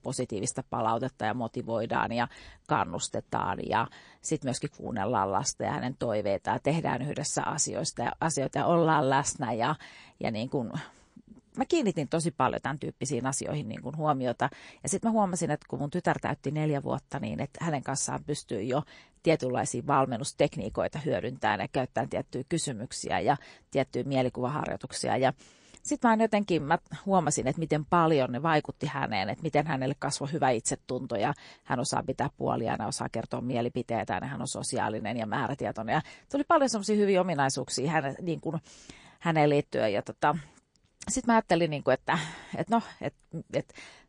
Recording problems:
garbled, watery; slightly

